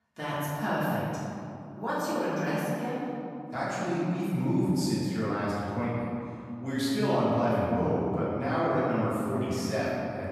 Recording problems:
room echo; strong; dies away in 2.4 s
off-mic speech; far

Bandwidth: 14.5 kHz